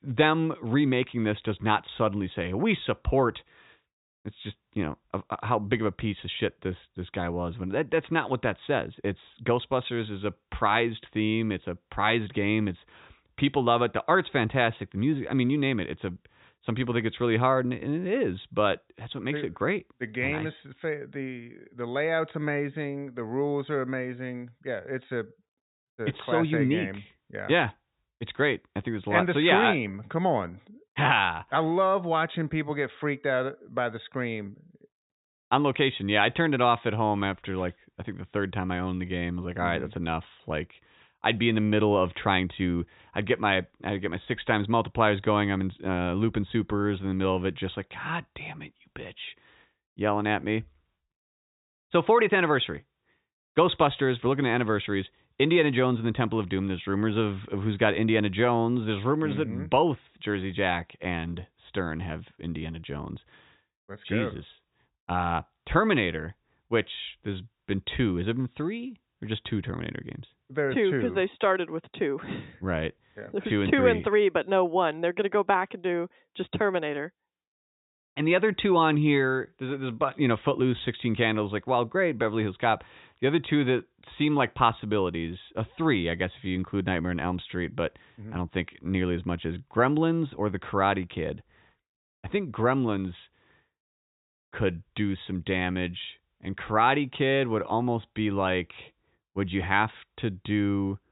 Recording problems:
high frequencies cut off; severe; nothing above 4 kHz

